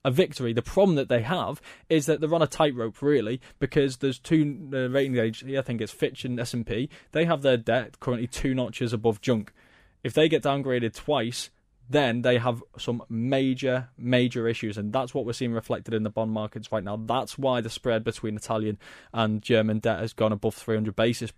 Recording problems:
none

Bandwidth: 15 kHz